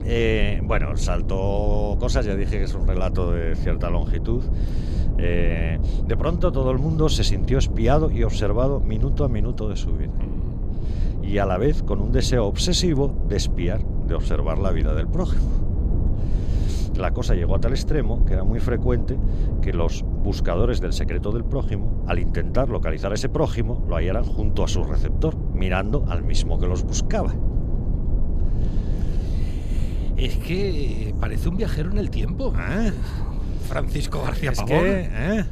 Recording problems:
low rumble; noticeable; throughout; 10 dB below the speech

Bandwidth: 14 kHz